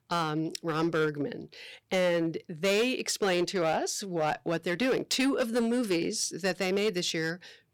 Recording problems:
distortion; slight; 7% of the sound clipped

